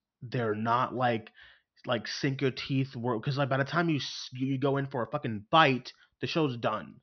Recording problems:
high frequencies cut off; noticeable; nothing above 6 kHz

